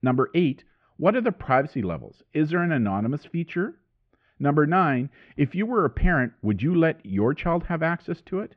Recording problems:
muffled; very; fading above 2.5 kHz

